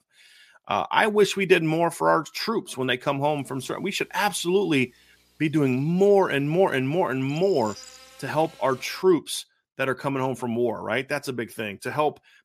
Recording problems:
electrical hum; faint; from 3.5 to 9 s; 60 Hz, 25 dB below the speech

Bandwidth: 14.5 kHz